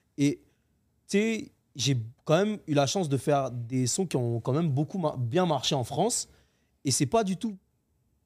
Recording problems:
none

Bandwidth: 15 kHz